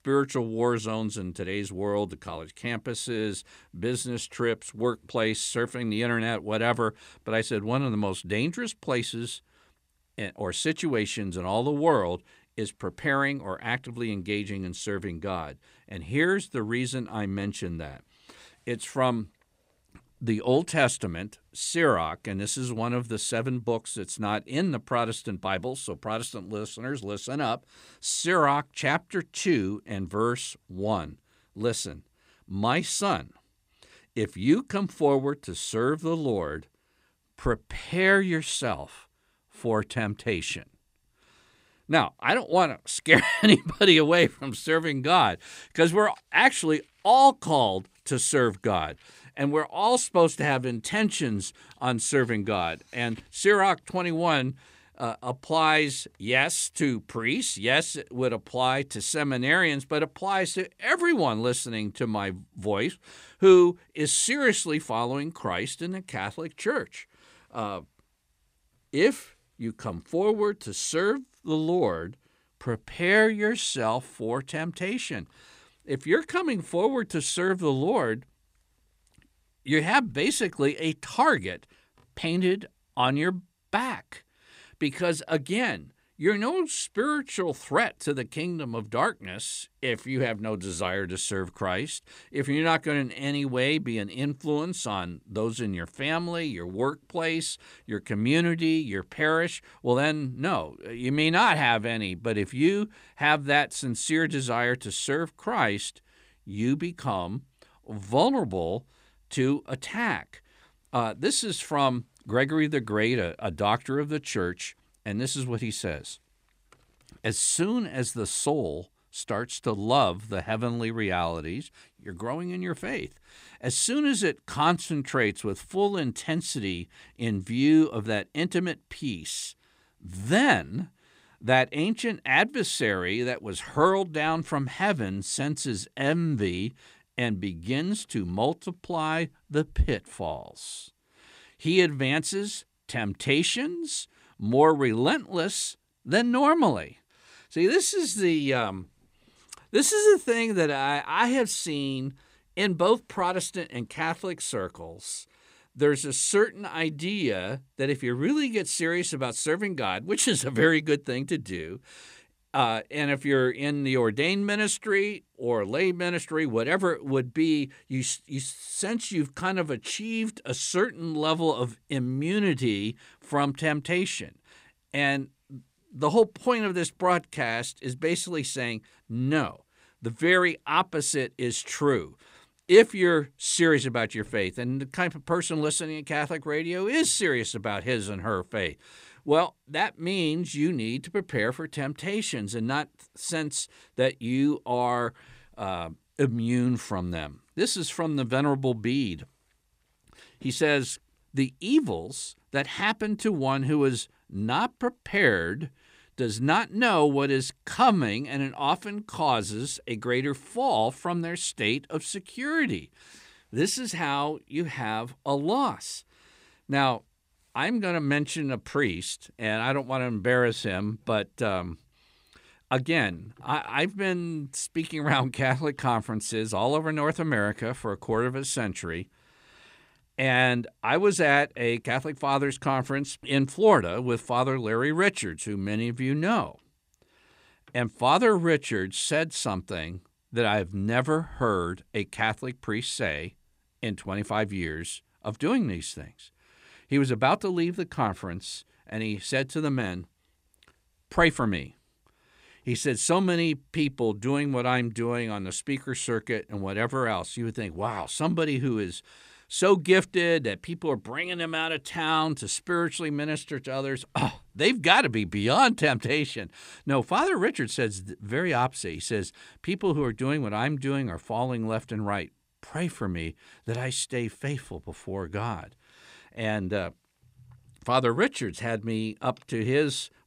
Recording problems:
none

